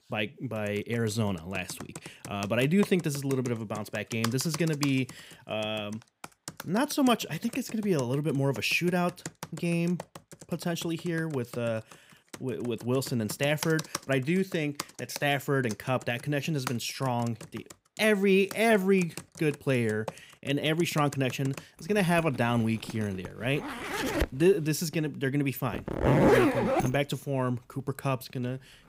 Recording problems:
household noises; loud; throughout; 5 dB below the speech

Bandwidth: 15.5 kHz